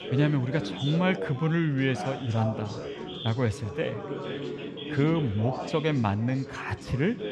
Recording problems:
background chatter; loud; throughout; 4 voices, 8 dB below the speech

